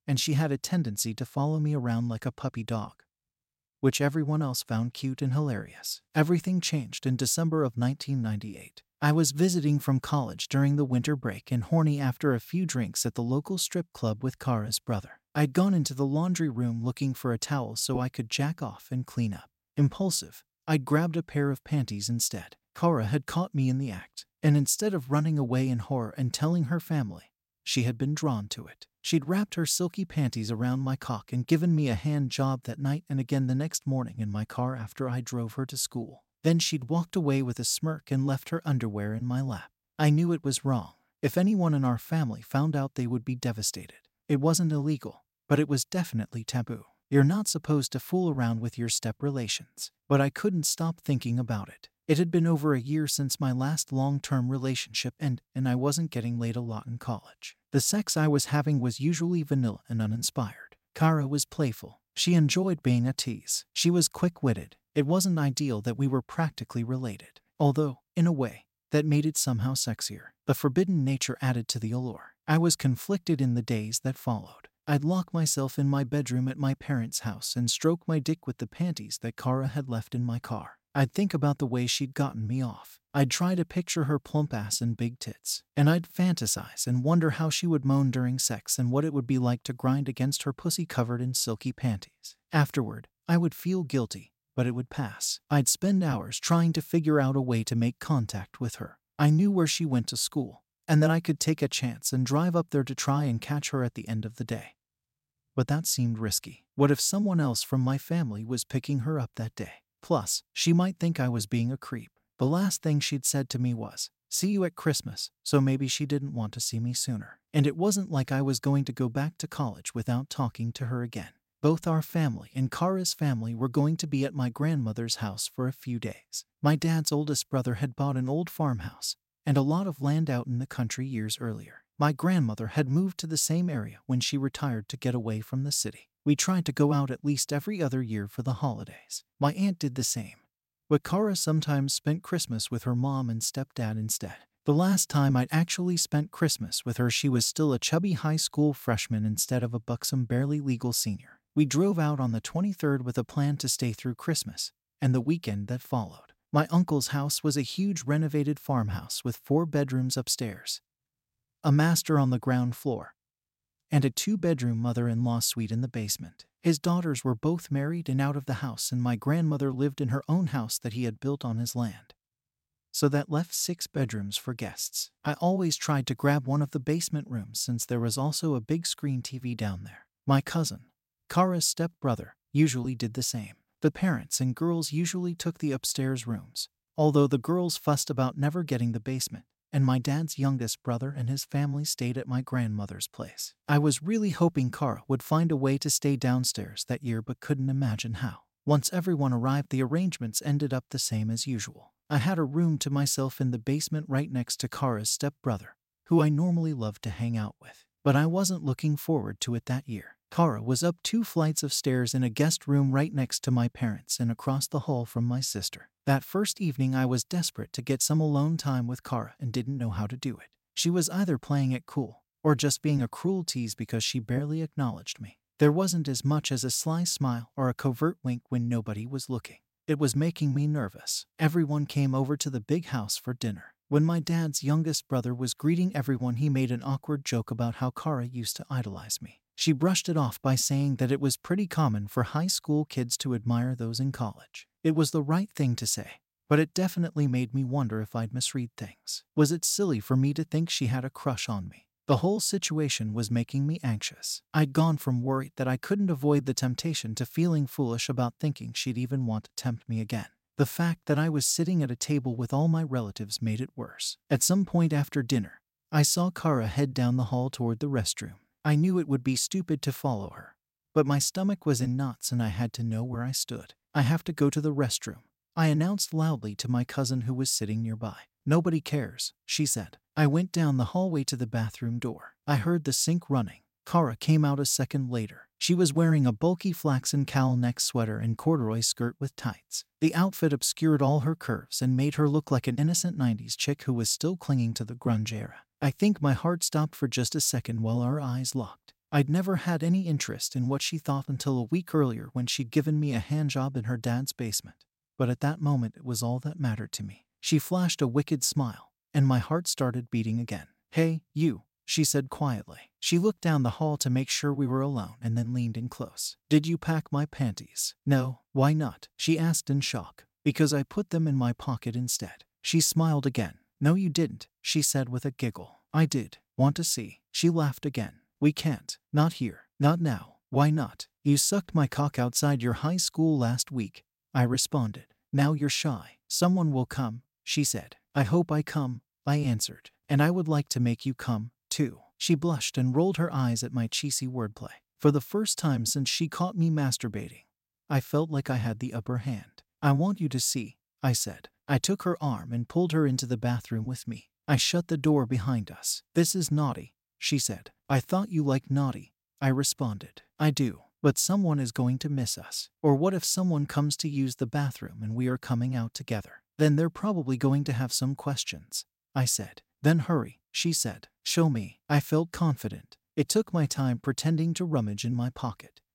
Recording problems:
none

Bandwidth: 16 kHz